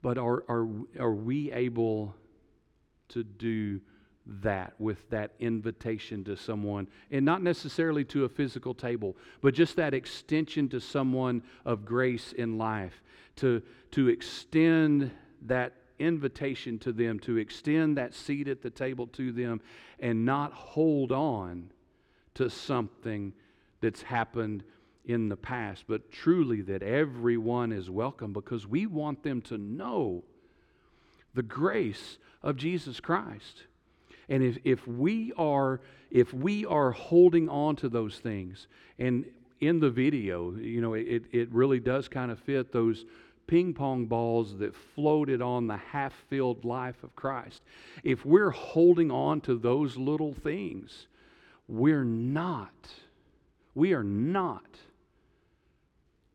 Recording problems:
muffled; very slightly; fading above 2 kHz

